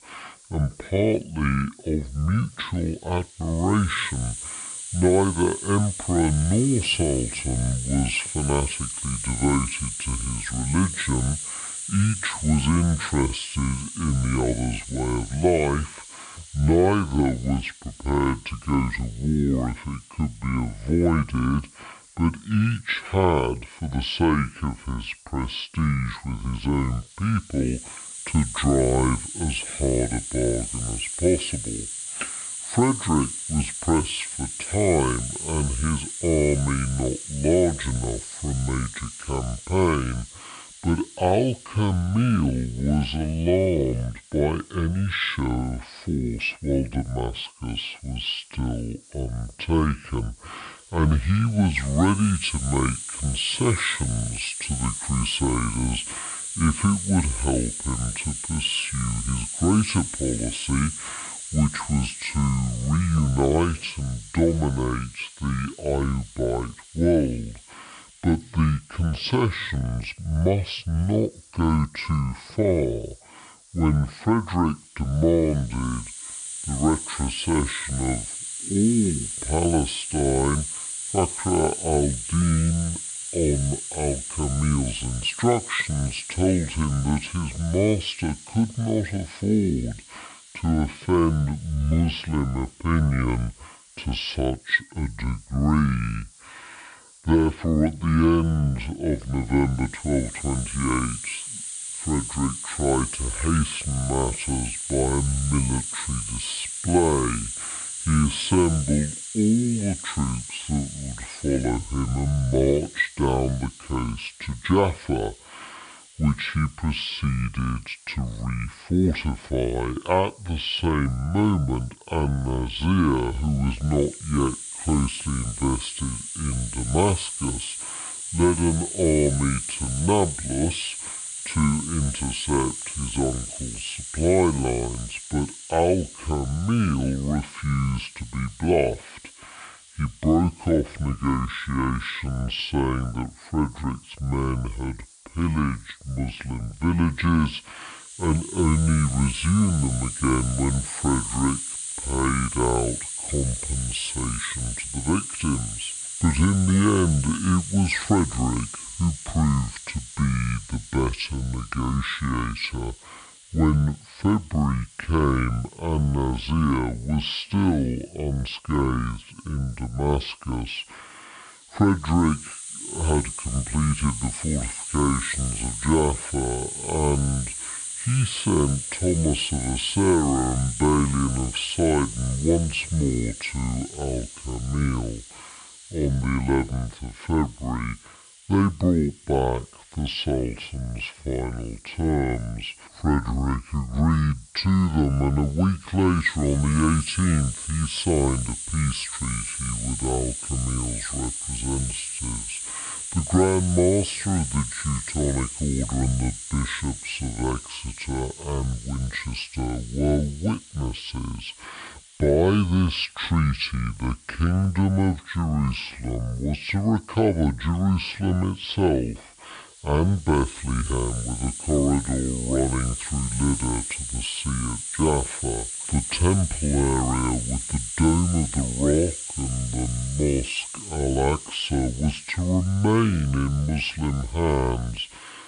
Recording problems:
wrong speed and pitch; too slow and too low; 0.6 times normal speed
high frequencies cut off; noticeable; nothing above 5.5 kHz
hiss; loud; throughout; 7 dB below the speech

